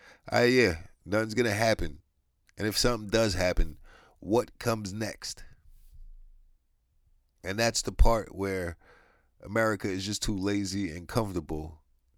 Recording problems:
none

